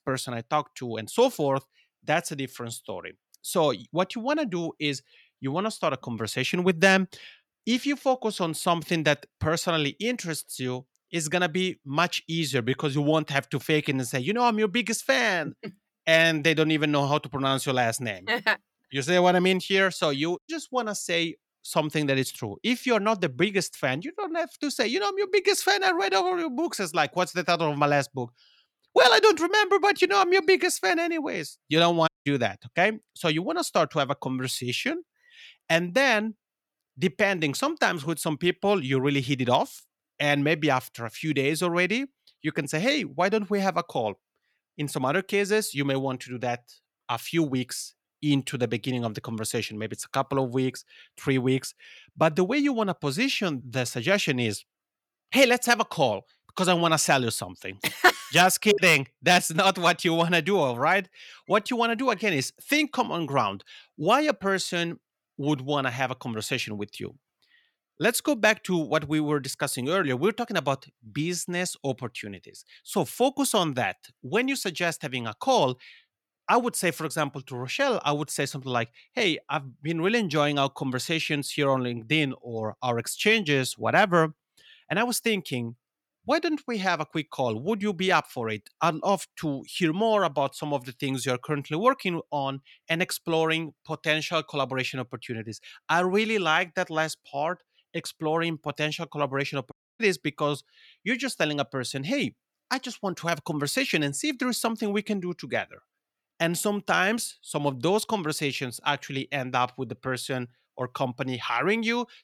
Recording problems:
audio cutting out; at 32 s and at 1:40

